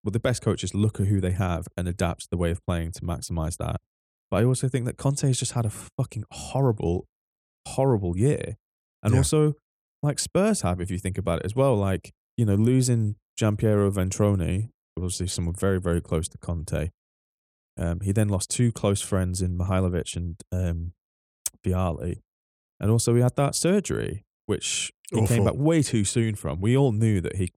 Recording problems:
none

